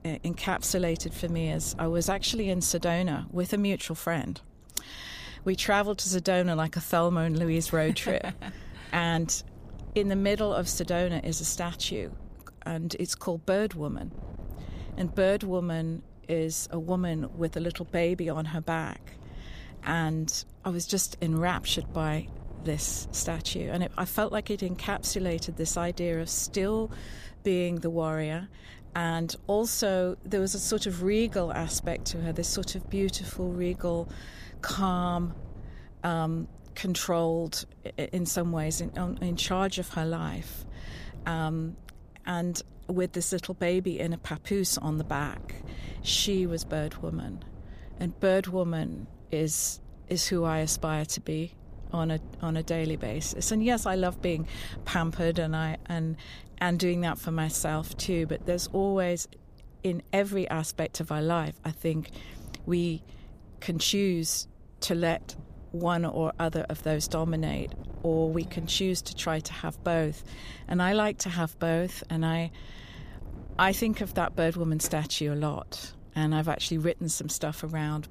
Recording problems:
wind noise on the microphone; occasional gusts; 25 dB below the speech

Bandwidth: 15 kHz